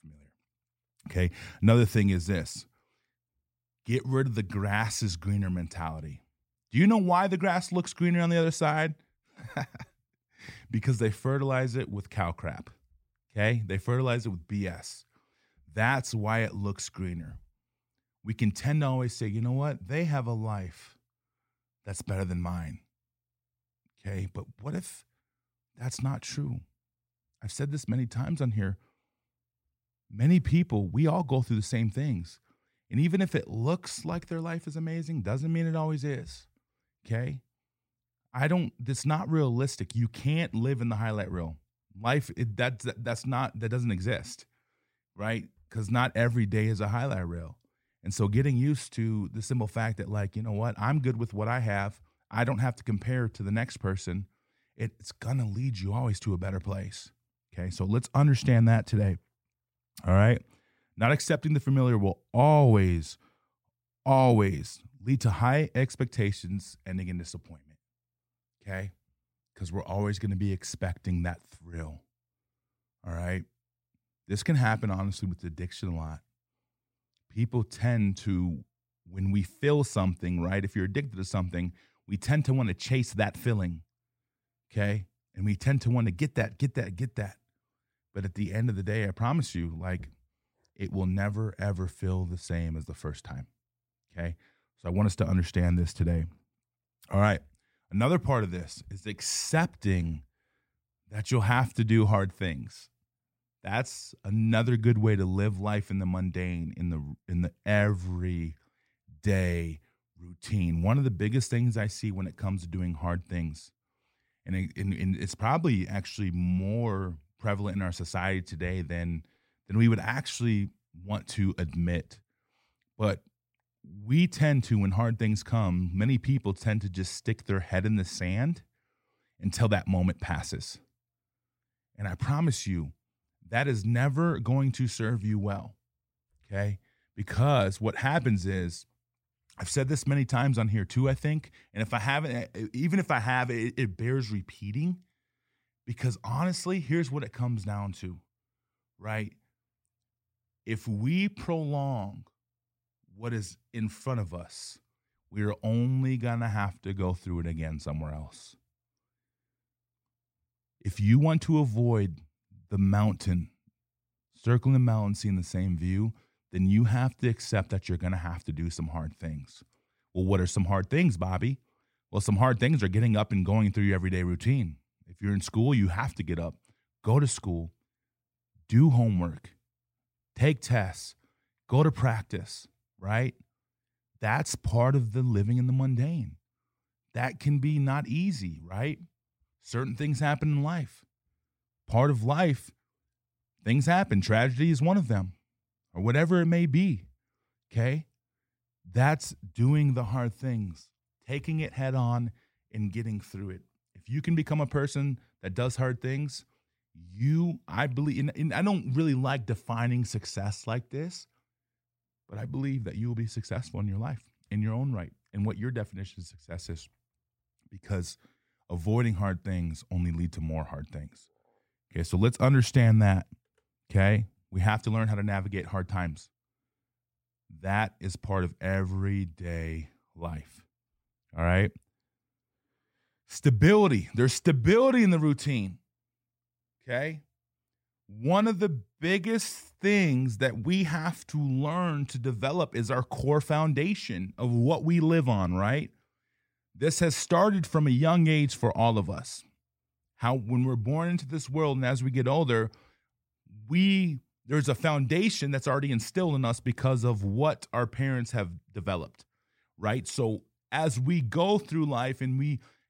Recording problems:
none

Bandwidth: 16 kHz